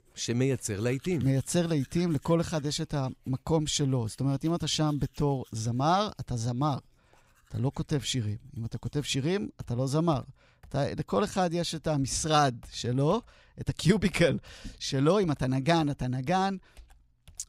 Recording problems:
household noises; faint; throughout; 30 dB below the speech

